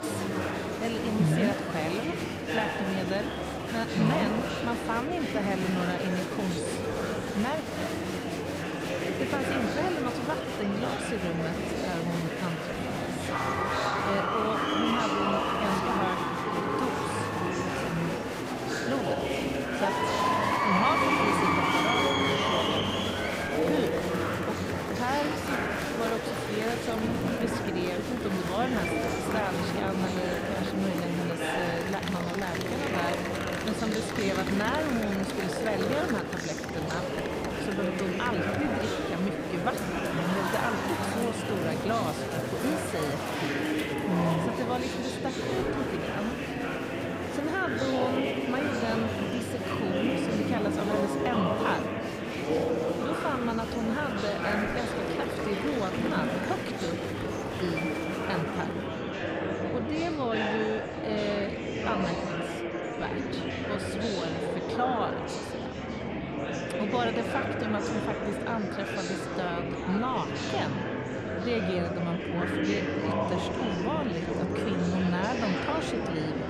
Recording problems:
murmuring crowd; very loud; throughout; 3 dB above the speech

